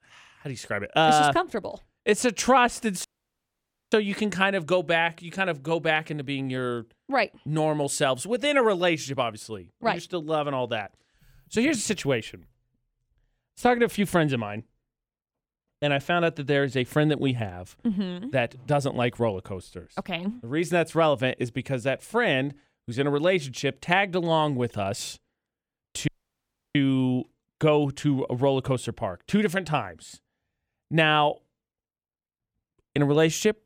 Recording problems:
audio cutting out; at 3 s for 1 s and at 26 s for 0.5 s

